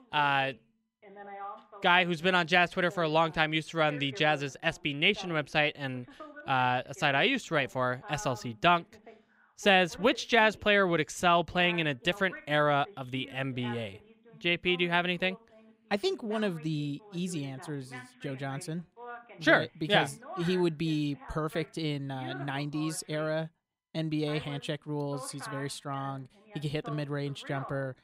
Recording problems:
voice in the background; noticeable; throughout; 20 dB below the speech

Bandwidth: 15.5 kHz